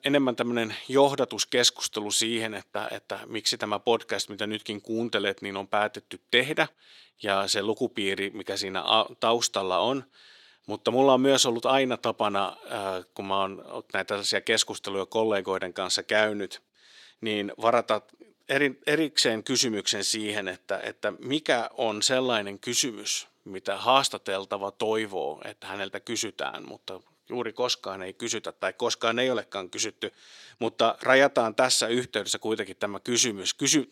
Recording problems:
thin; somewhat; fading below 350 Hz

